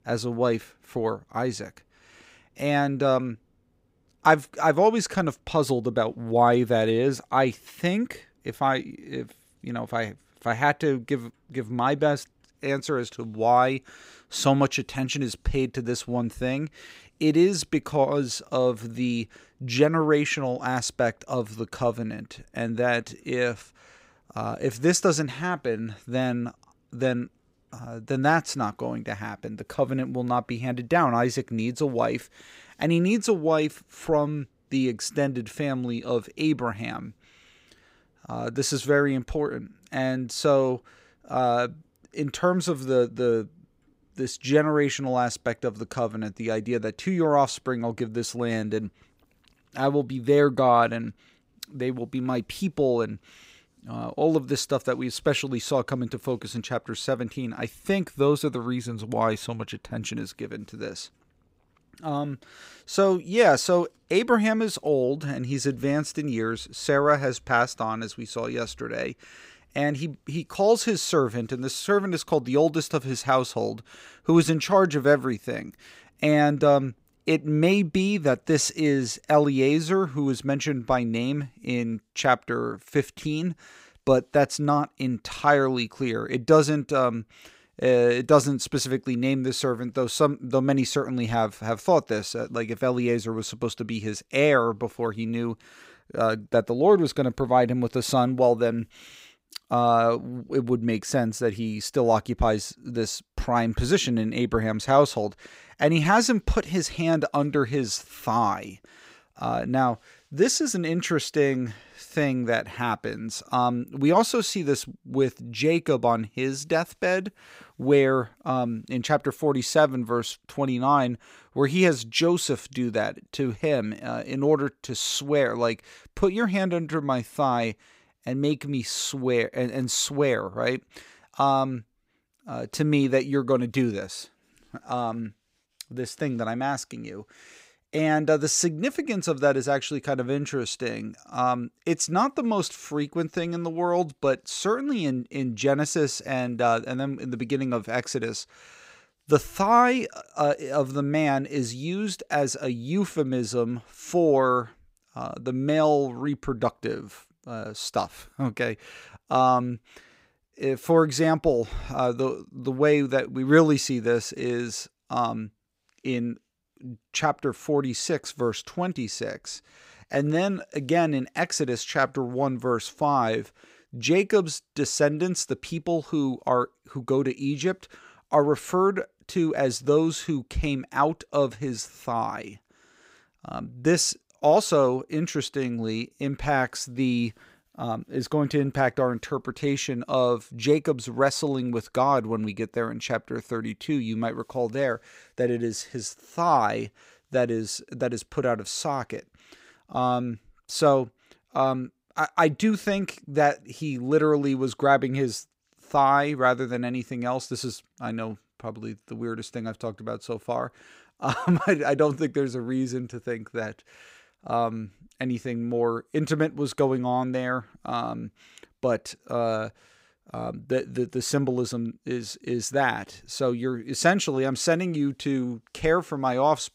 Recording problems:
none

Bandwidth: 15.5 kHz